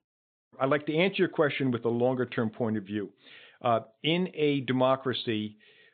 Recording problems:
high frequencies cut off; severe; nothing above 4 kHz

